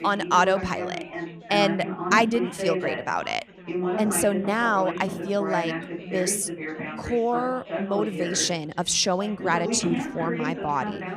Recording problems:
background chatter; loud; throughout; 4 voices, 6 dB below the speech

